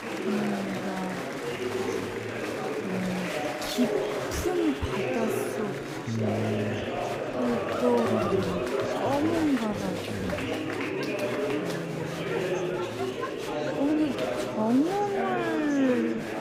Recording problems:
wrong speed, natural pitch; too slow; 0.6 times normal speed
murmuring crowd; loud; throughout; as loud as the speech

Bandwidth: 15.5 kHz